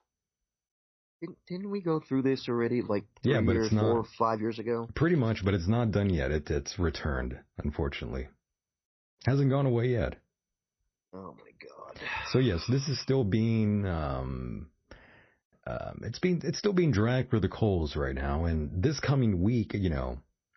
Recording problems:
garbled, watery; slightly; nothing above 6 kHz
crackling; faint; at 5 s; 25 dB below the speech
uneven, jittery; slightly; from 1.5 to 16 s

